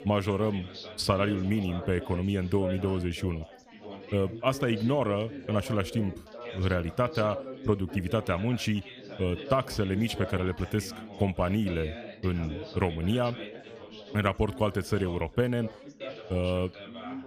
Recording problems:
background chatter; noticeable; throughout; 4 voices, 10 dB below the speech

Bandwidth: 15 kHz